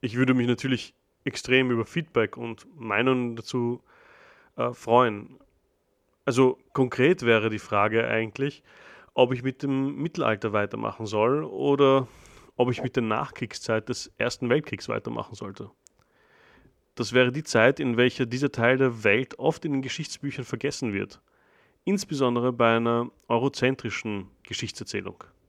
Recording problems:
none

